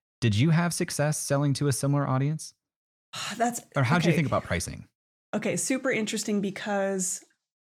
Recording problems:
none

